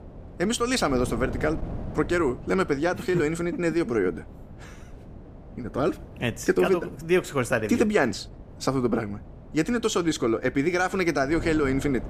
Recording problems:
wind noise on the microphone; occasional gusts; 20 dB below the speech

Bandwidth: 14.5 kHz